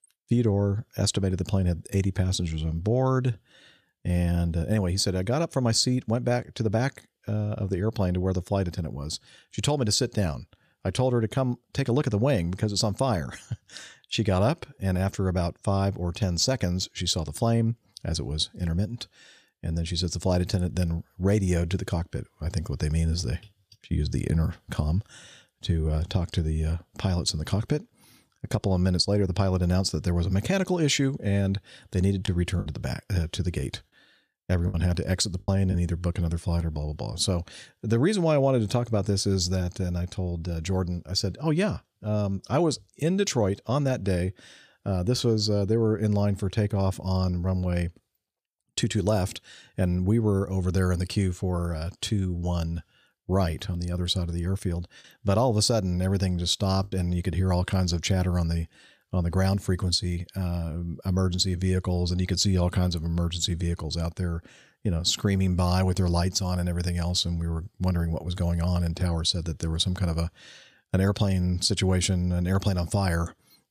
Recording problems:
choppy; occasionally; from 32 to 36 s and at 57 s; 4% of the speech affected

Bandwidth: 14.5 kHz